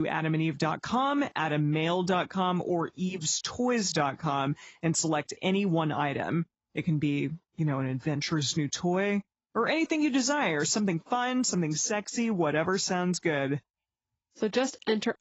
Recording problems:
garbled, watery; badly; nothing above 7.5 kHz
abrupt cut into speech; at the start

